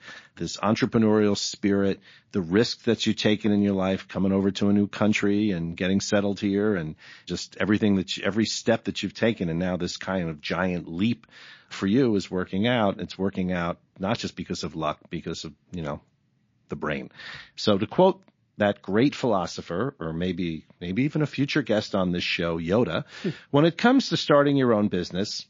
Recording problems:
garbled, watery; slightly

